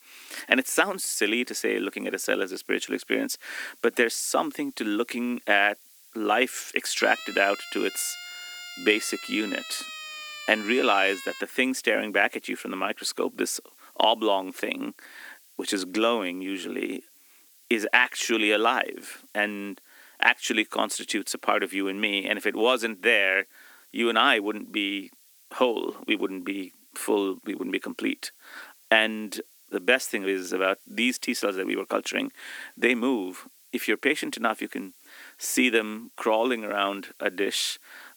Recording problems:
thin; somewhat; fading below 250 Hz
hiss; faint; throughout; 25 dB below the speech
siren; faint; from 7 to 11 s; peak 10 dB below the speech

